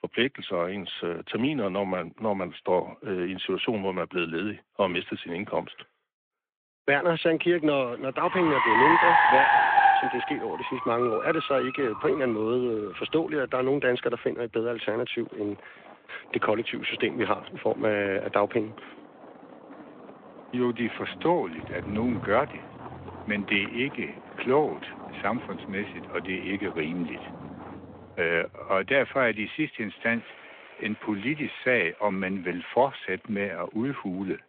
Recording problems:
phone-call audio
traffic noise; very loud; from 7.5 s on; 2 dB above the speech

